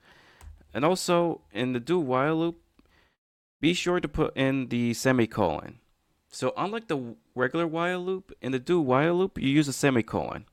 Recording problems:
none

